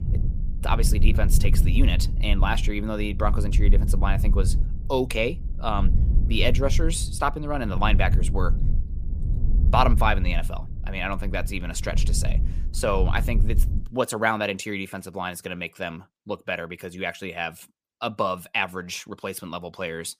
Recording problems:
low rumble; noticeable; until 14 s; 15 dB below the speech

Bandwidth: 15 kHz